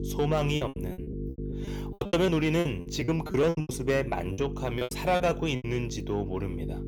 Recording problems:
distortion; slight; 10 dB below the speech
electrical hum; noticeable; throughout; 50 Hz, 15 dB below the speech
choppy; very; from 0.5 to 3.5 s and from 4.5 to 5.5 s; 27% of the speech affected

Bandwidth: 18.5 kHz